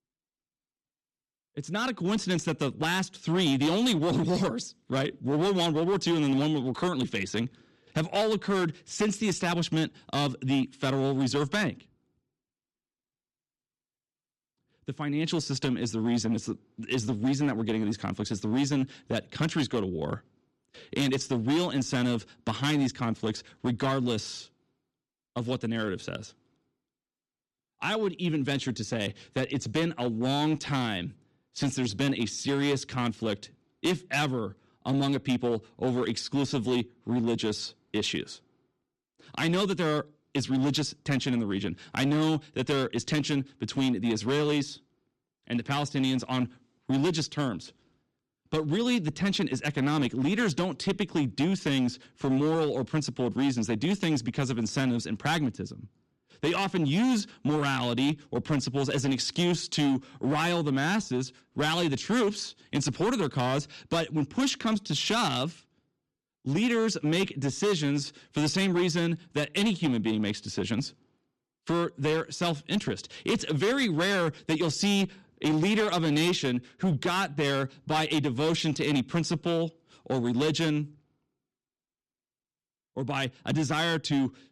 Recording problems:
distortion; slight; 9% of the sound clipped

